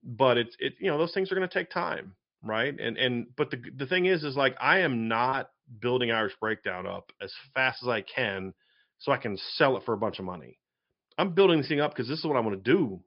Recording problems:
high frequencies cut off; noticeable; nothing above 5.5 kHz

